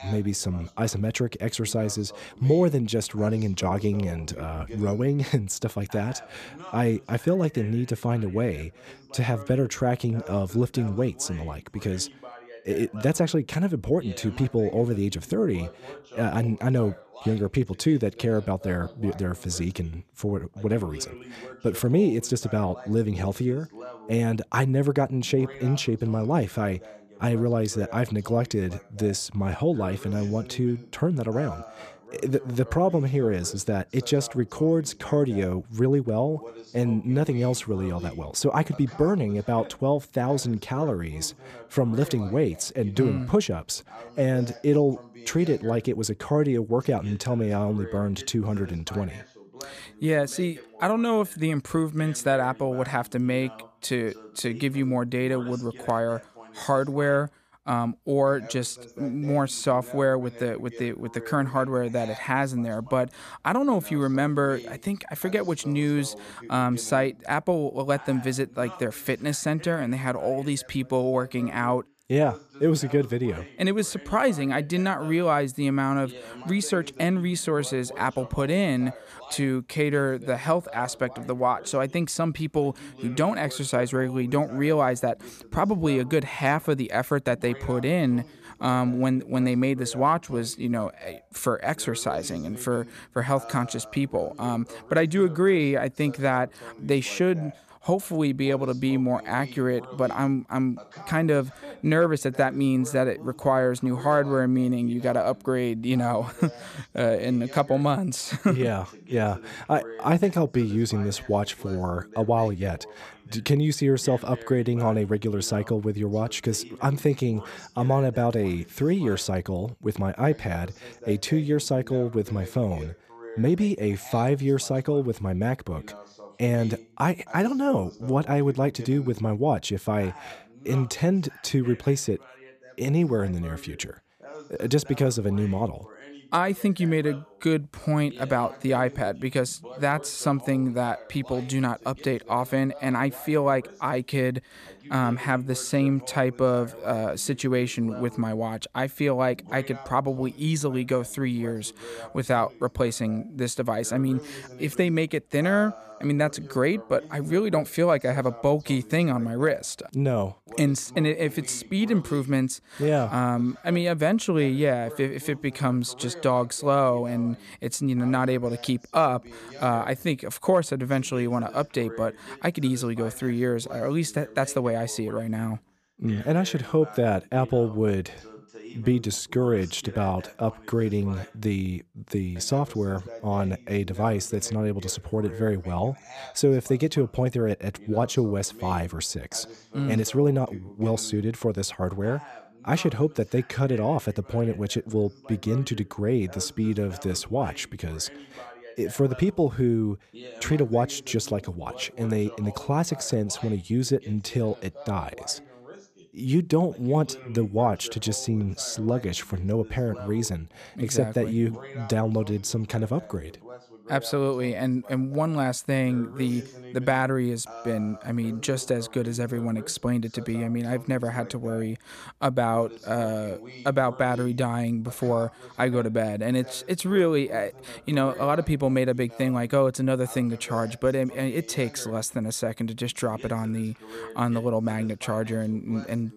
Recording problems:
voice in the background; noticeable; throughout; 20 dB below the speech

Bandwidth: 14.5 kHz